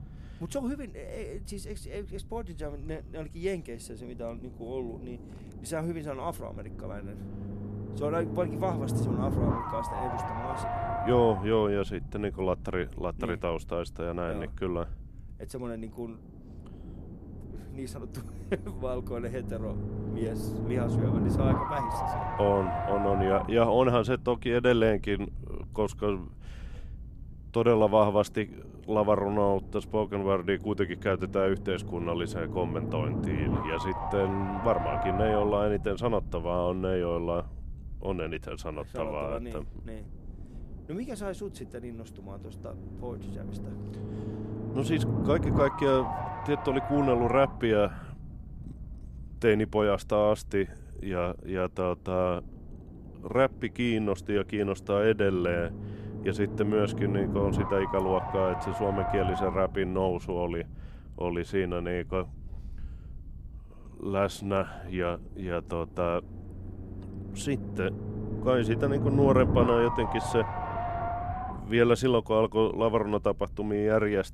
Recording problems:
low rumble; loud; throughout; 5 dB below the speech

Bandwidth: 13.5 kHz